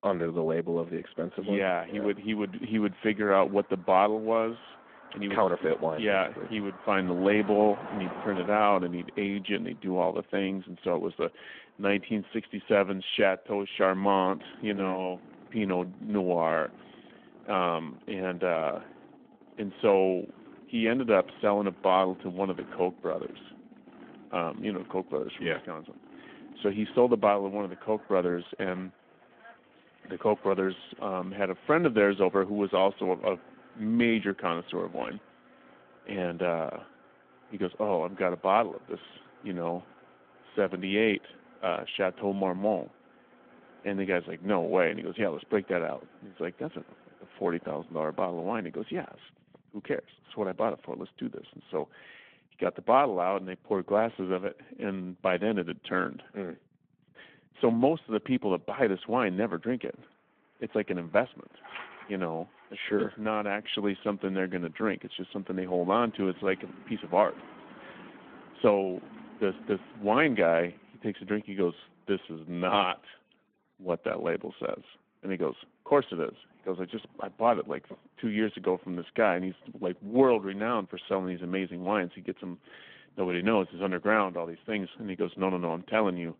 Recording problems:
phone-call audio
traffic noise; faint; throughout; 20 dB below the speech

